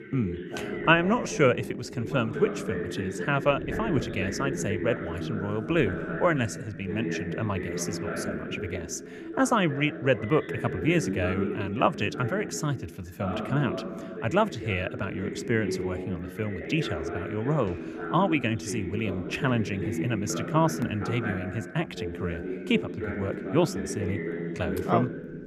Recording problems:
voice in the background; loud; throughout; 5 dB below the speech

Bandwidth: 14 kHz